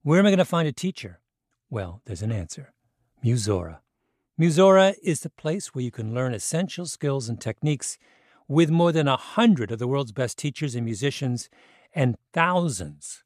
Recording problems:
none

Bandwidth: 14.5 kHz